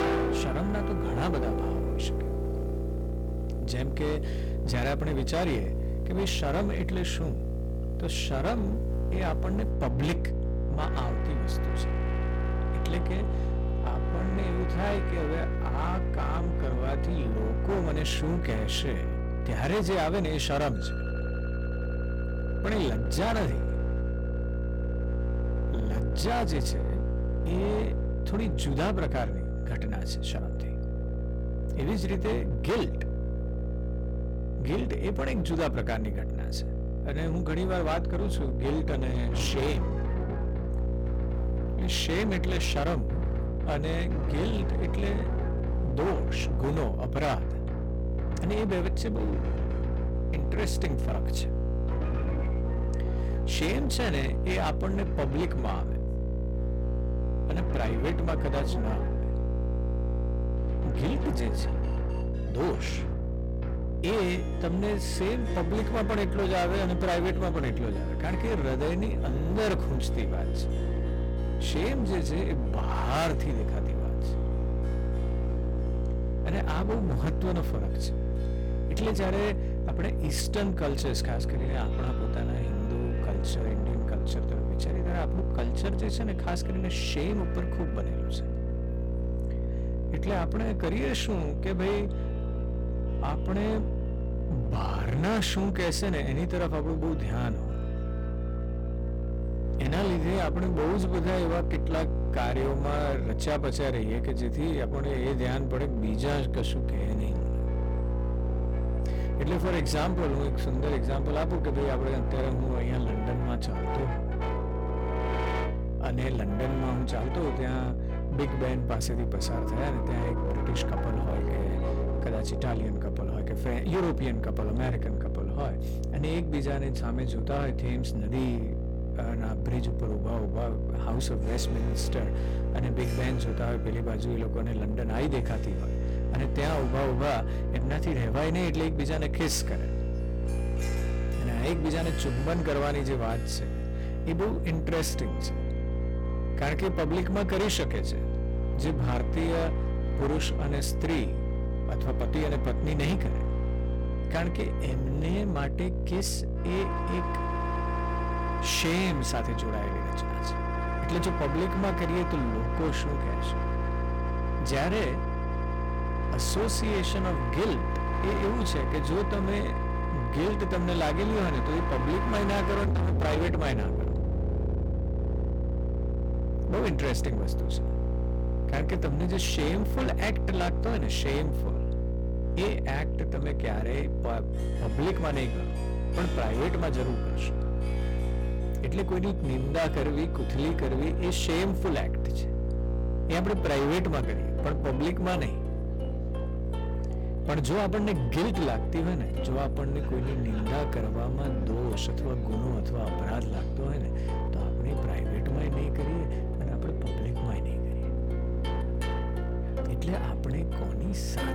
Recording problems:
distortion; heavy; 25% of the sound clipped
electrical hum; loud; throughout; 60 Hz, 7 dB below the speech
background music; loud; throughout; 9 dB below the speech

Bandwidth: 18 kHz